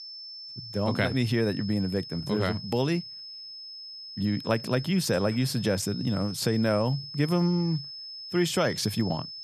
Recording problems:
high-pitched whine; noticeable; throughout; 5 kHz, 10 dB below the speech

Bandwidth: 14 kHz